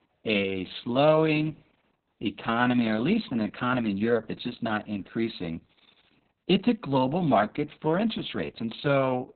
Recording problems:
garbled, watery; badly; nothing above 4 kHz

